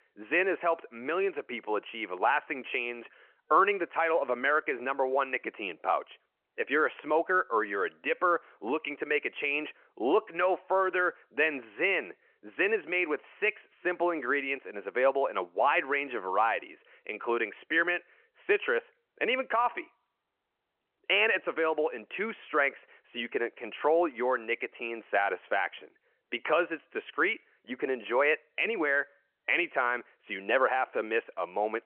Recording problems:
phone-call audio

